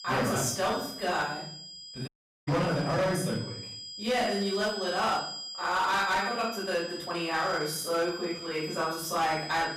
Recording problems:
off-mic speech; far
room echo; noticeable; dies away in 0.5 s
distortion; slight; 10% of the sound clipped
high-pitched whine; loud; throughout; 5 kHz, 9 dB below the speech
uneven, jittery; strongly; from 0.5 to 8.5 s
audio cutting out; at 2 s

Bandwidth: 15.5 kHz